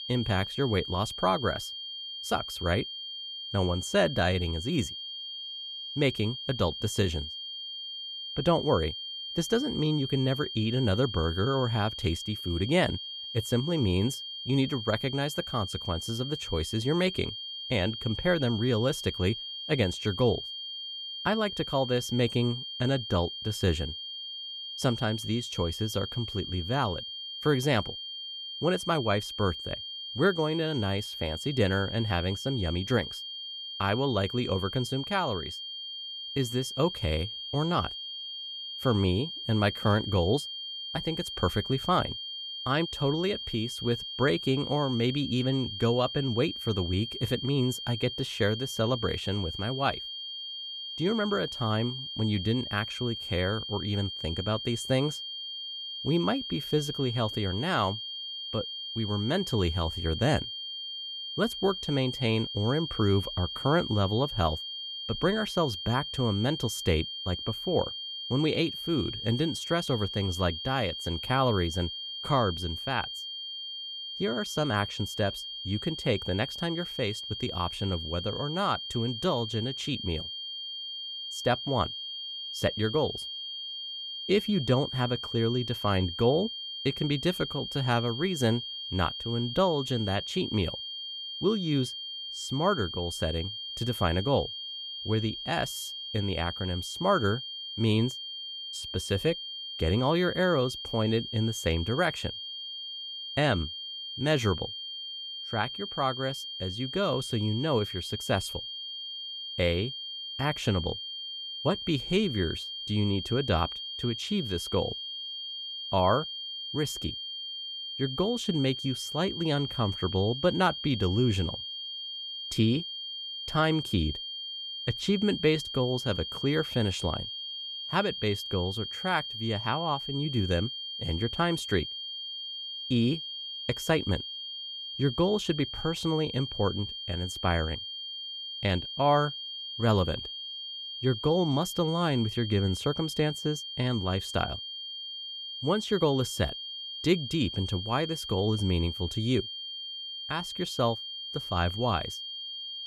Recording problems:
high-pitched whine; loud; throughout; 3 kHz, 6 dB below the speech

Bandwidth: 14 kHz